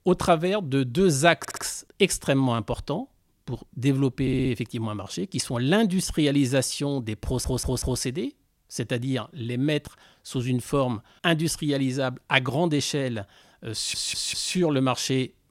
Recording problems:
audio stuttering; 4 times, first at 1.5 s

